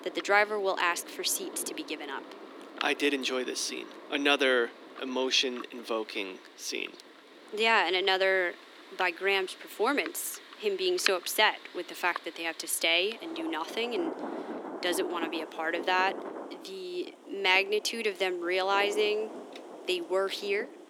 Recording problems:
thin; somewhat; fading below 300 Hz
rain or running water; noticeable; throughout; 15 dB below the speech

